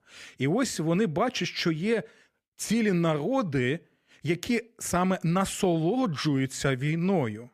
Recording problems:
none

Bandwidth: 14.5 kHz